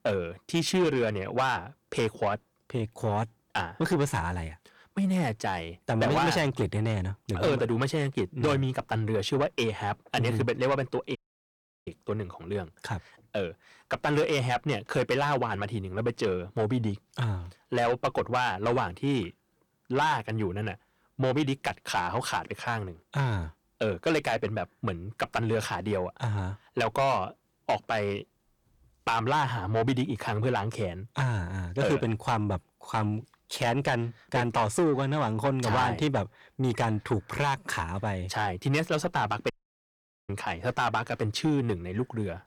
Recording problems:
distortion; heavy; 8 dB below the speech
audio cutting out; at 11 s for 0.5 s and at 40 s for 1 s

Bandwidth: 18.5 kHz